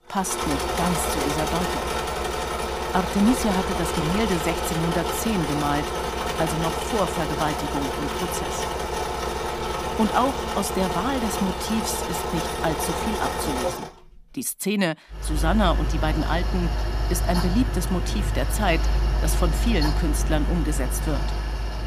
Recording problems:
machinery noise; loud; throughout; as loud as the speech

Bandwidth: 15 kHz